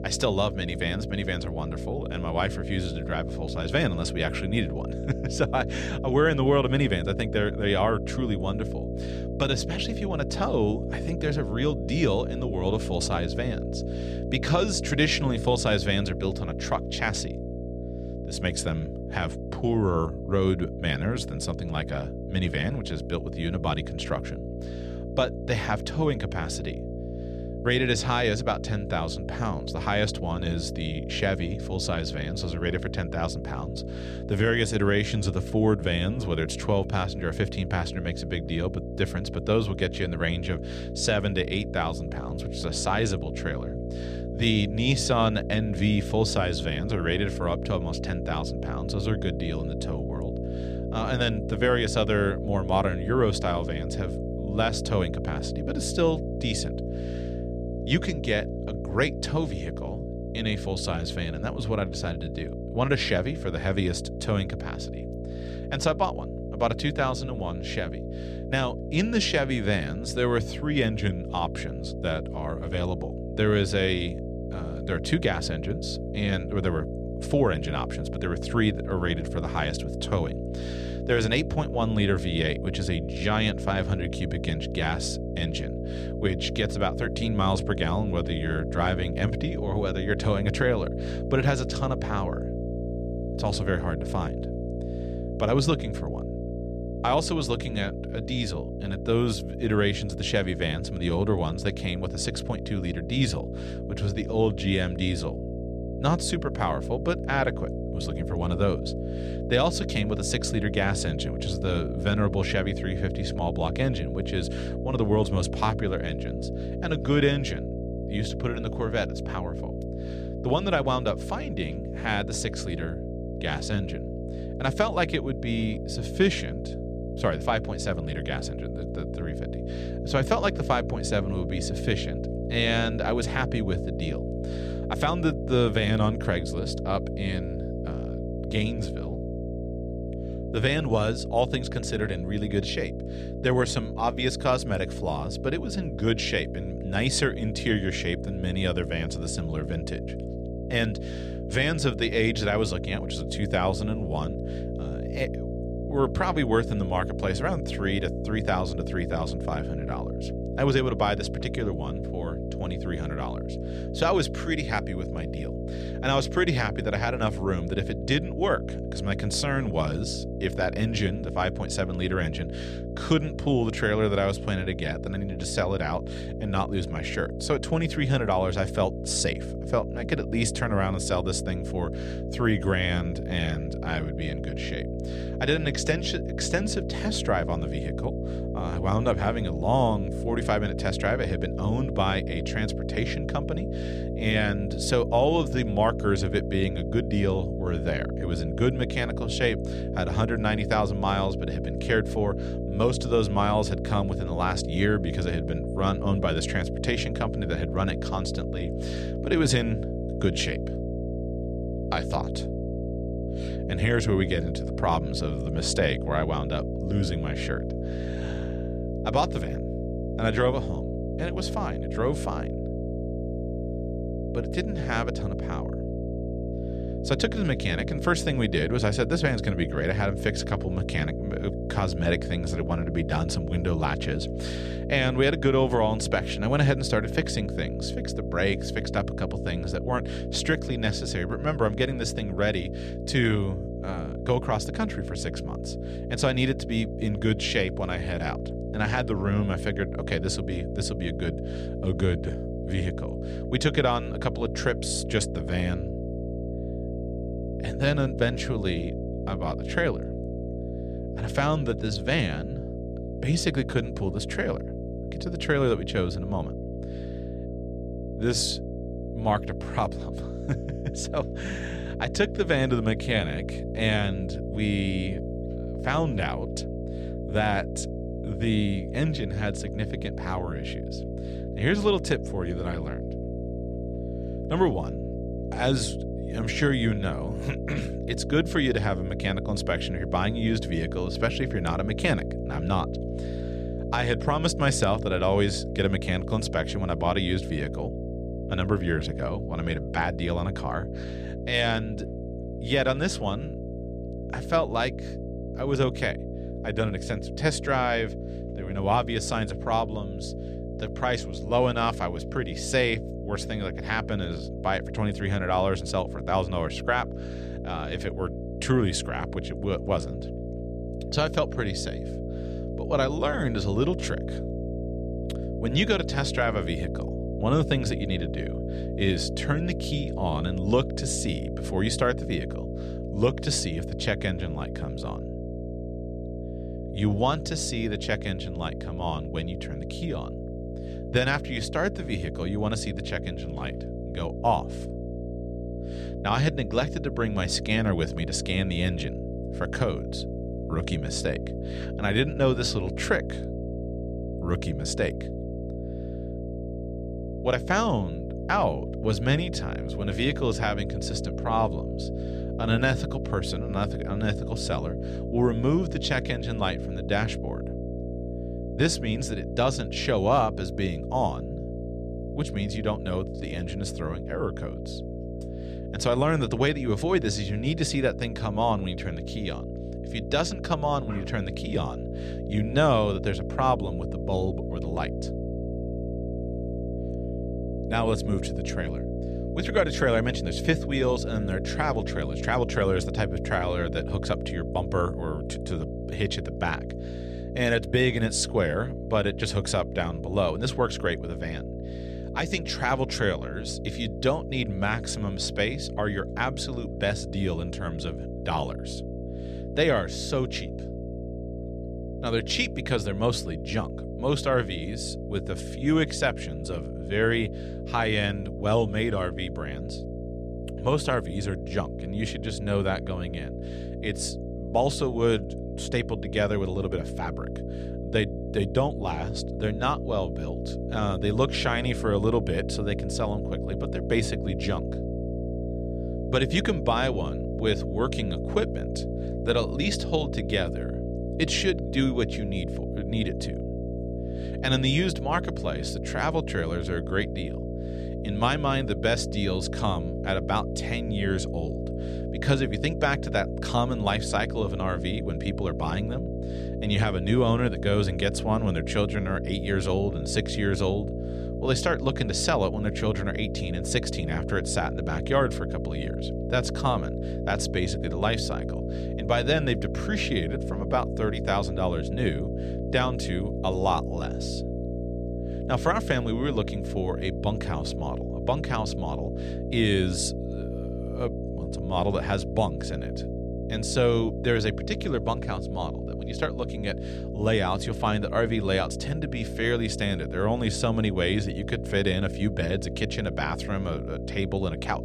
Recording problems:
electrical hum; loud; throughout; 60 Hz, 9 dB below the speech

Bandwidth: 14 kHz